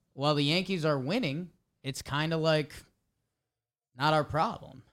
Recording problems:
none

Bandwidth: 16 kHz